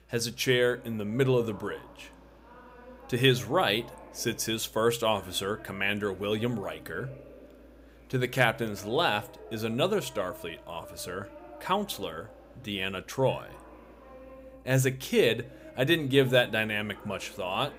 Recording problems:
voice in the background; faint; throughout; 20 dB below the speech

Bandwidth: 15.5 kHz